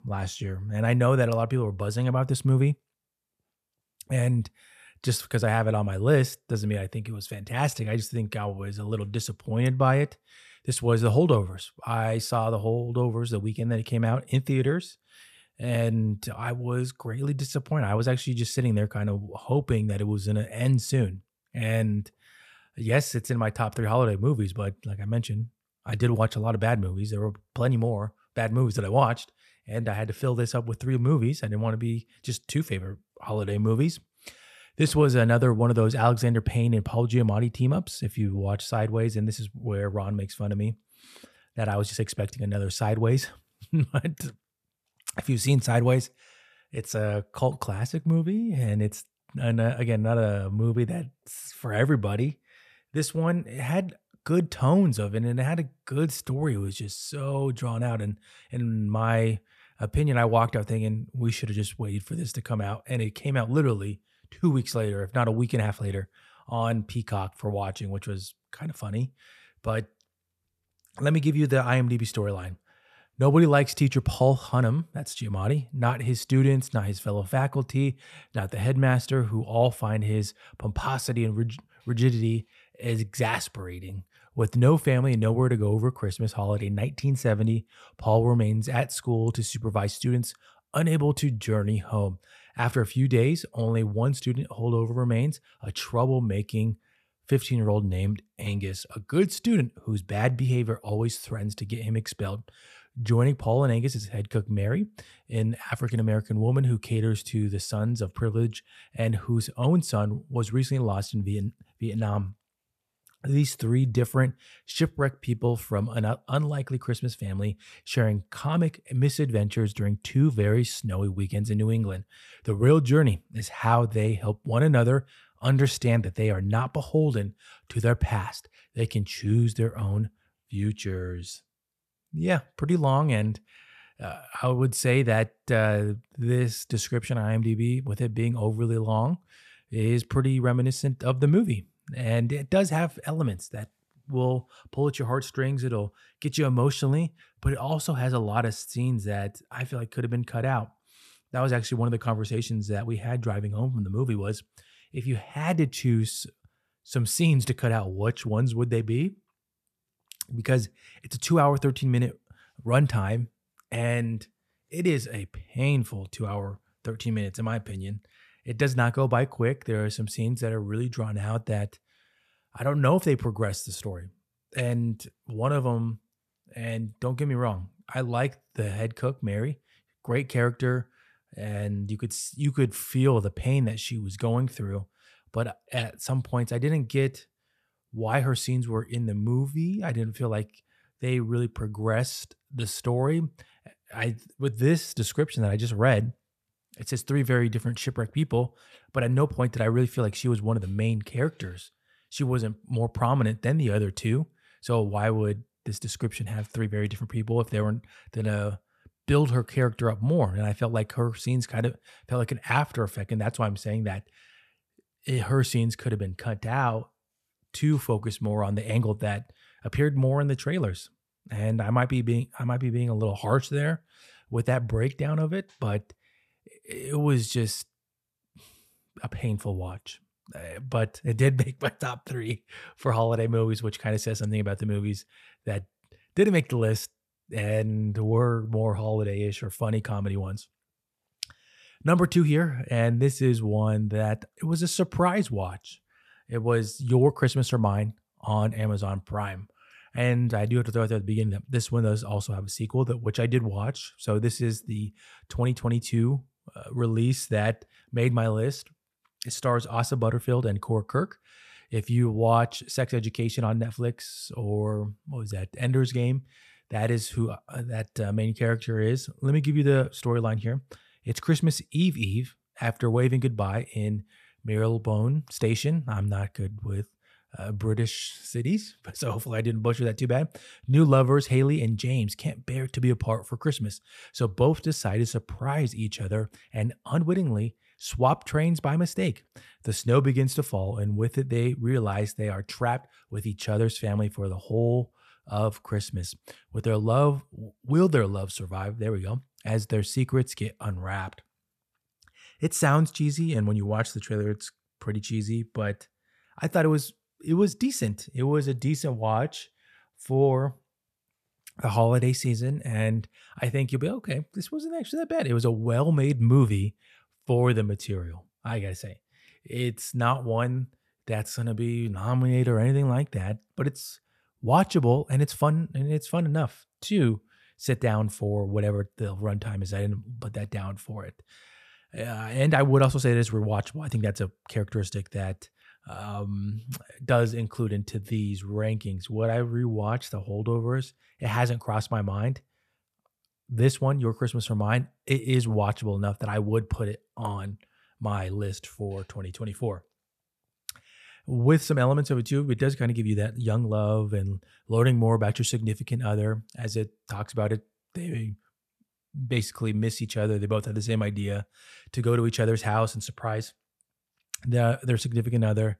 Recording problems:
none

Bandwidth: 14 kHz